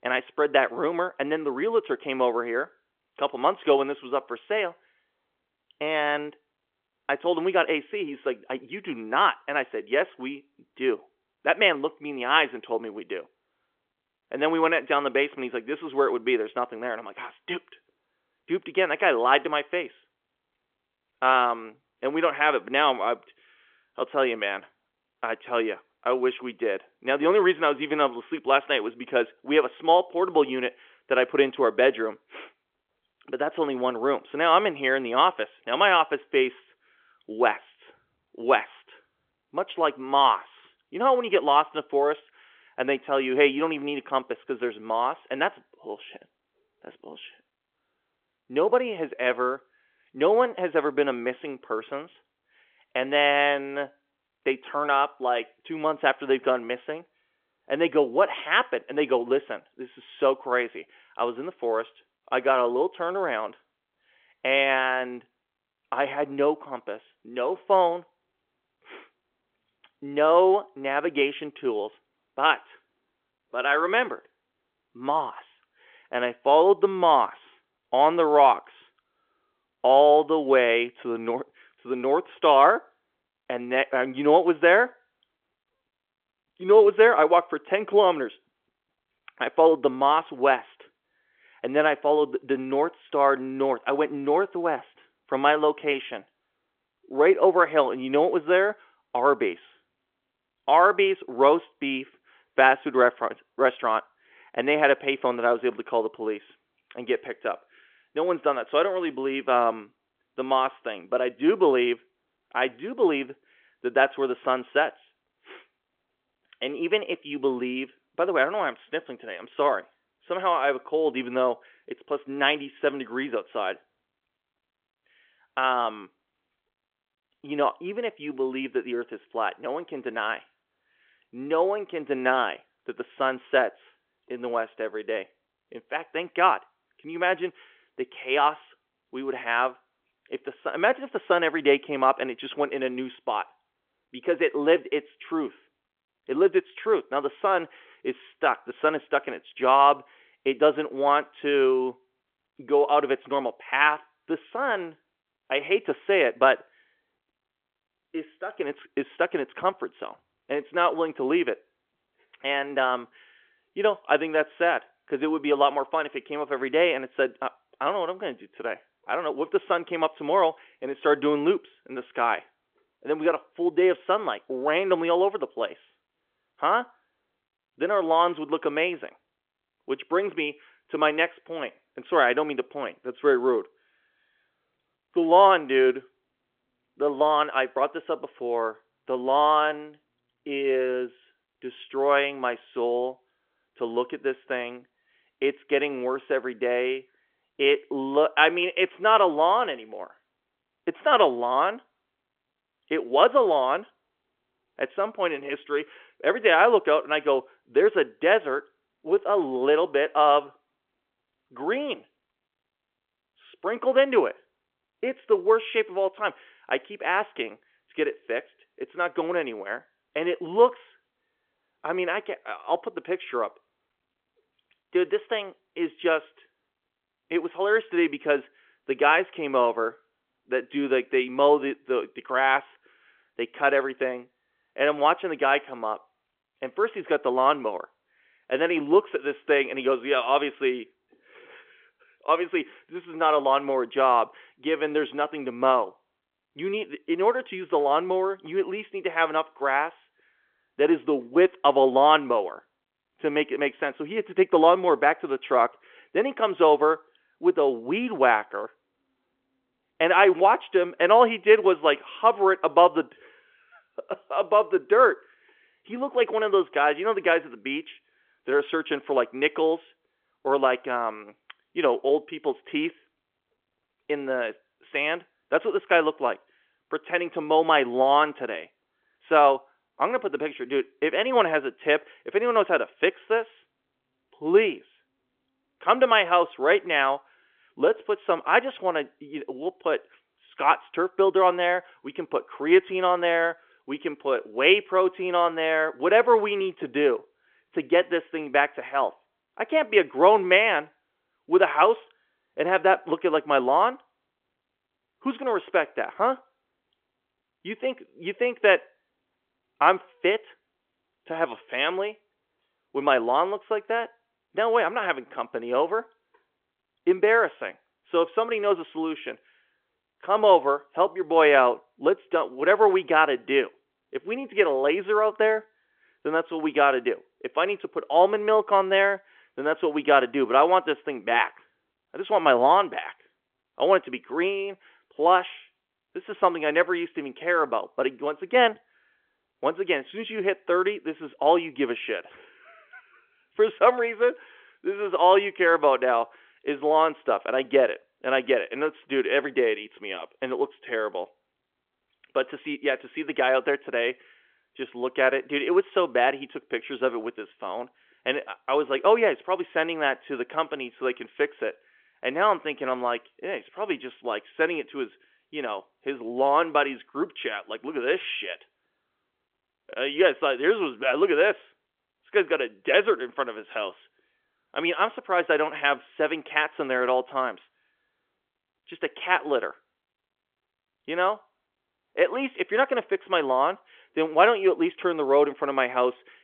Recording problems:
phone-call audio; nothing above 3.5 kHz

